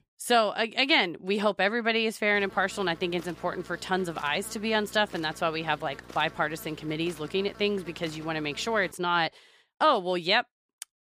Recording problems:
electrical hum; faint; from 2.5 to 9 s; 60 Hz, 20 dB below the speech

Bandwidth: 15 kHz